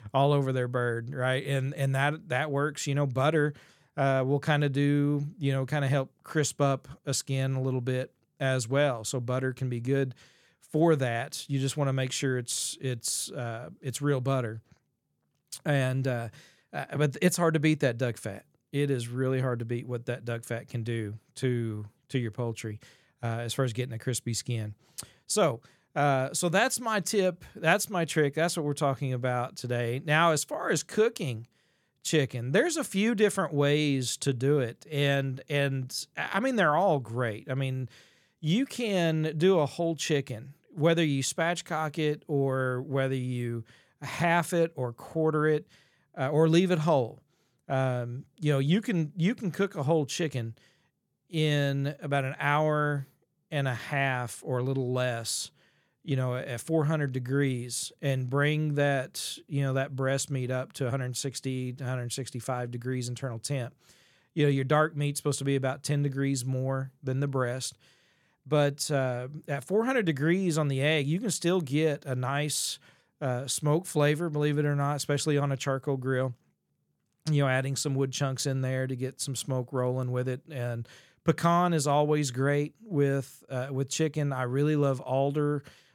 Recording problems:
none

